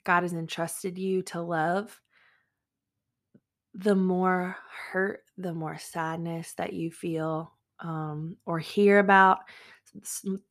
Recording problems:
none

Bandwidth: 14.5 kHz